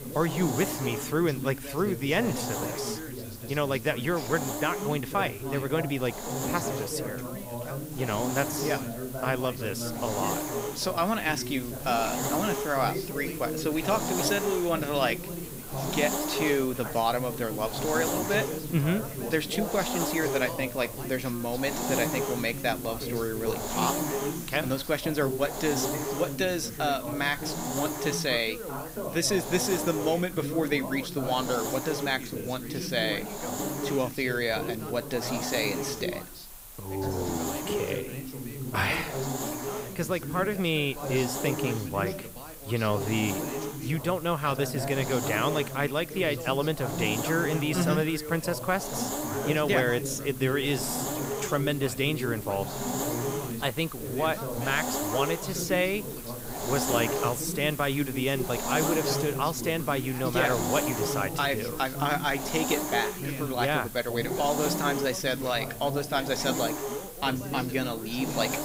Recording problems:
background chatter; loud; throughout; 2 voices, 8 dB below the speech
hiss; loud; throughout; 6 dB below the speech

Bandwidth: 15.5 kHz